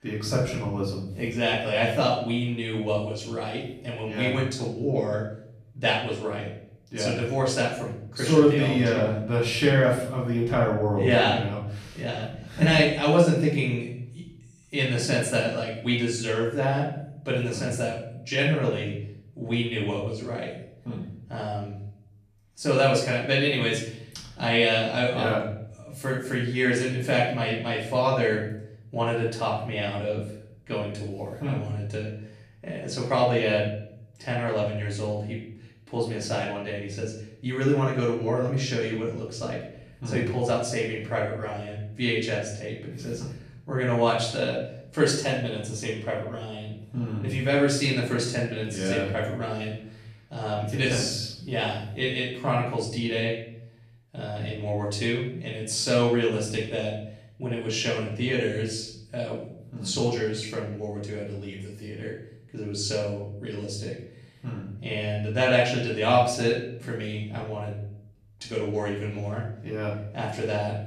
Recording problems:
off-mic speech; far
room echo; noticeable; dies away in 0.6 s

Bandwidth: 14.5 kHz